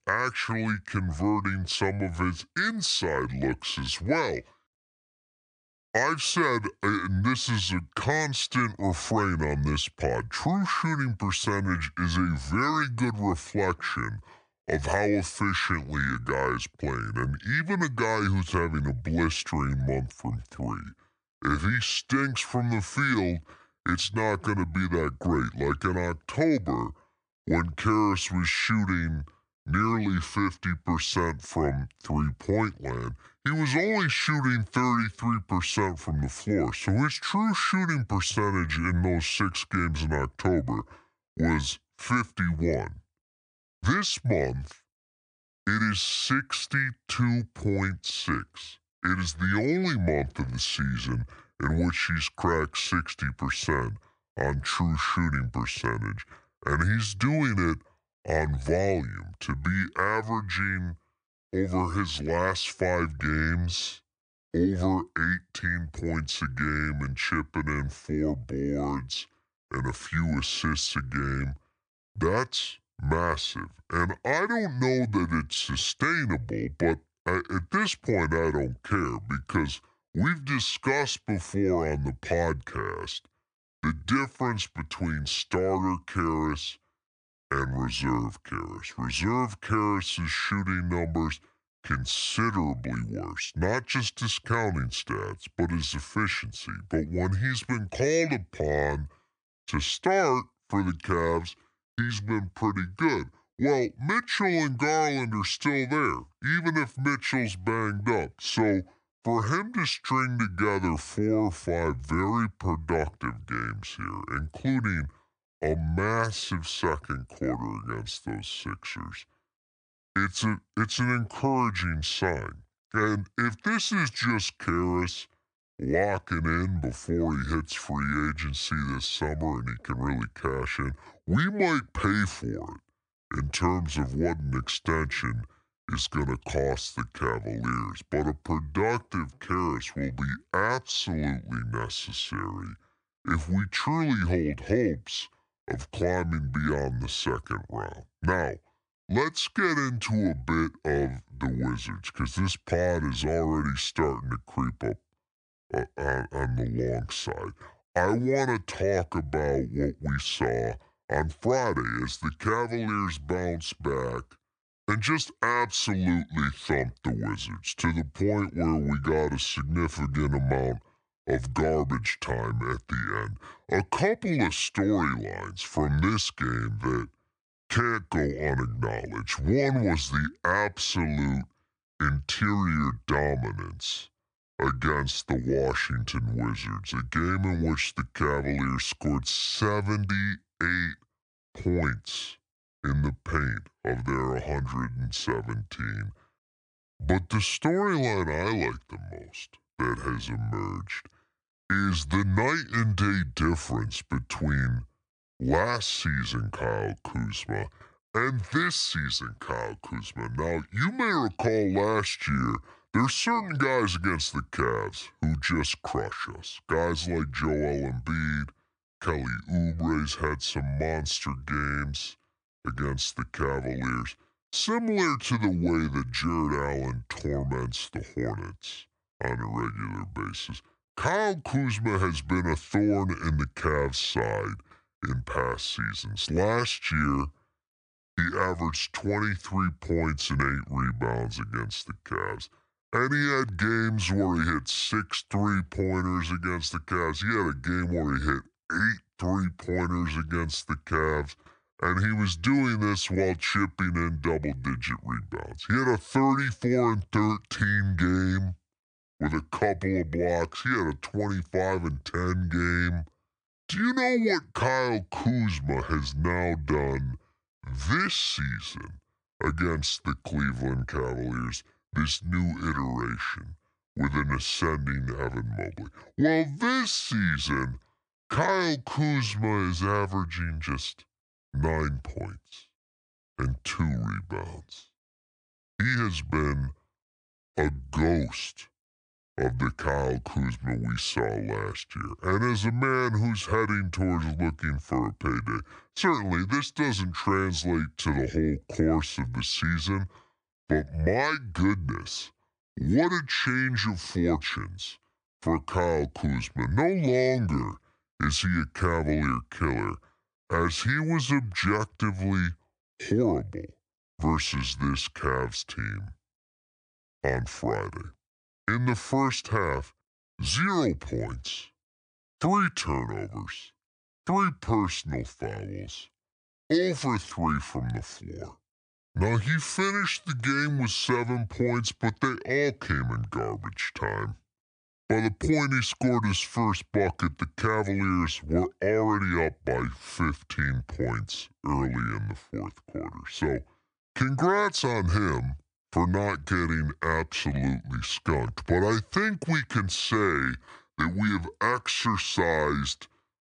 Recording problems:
wrong speed and pitch; too slow and too low; 0.7 times normal speed

